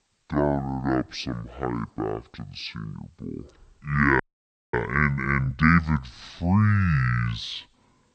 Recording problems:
wrong speed and pitch; too slow and too low; 0.5 times normal speed
audio freezing; at 4 s for 0.5 s

